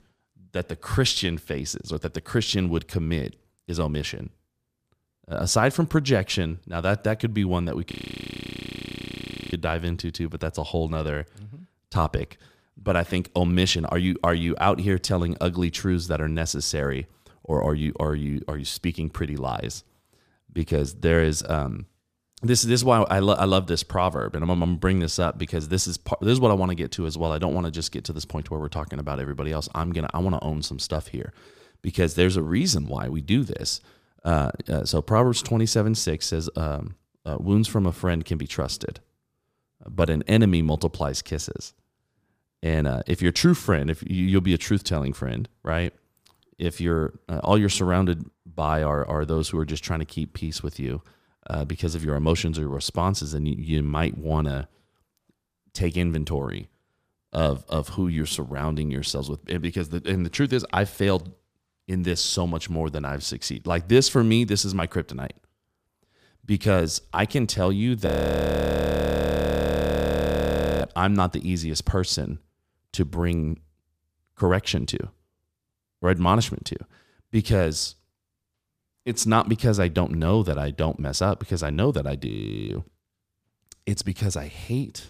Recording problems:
audio freezing; at 8 s for 1.5 s, at 1:08 for 3 s and at 1:22

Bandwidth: 15 kHz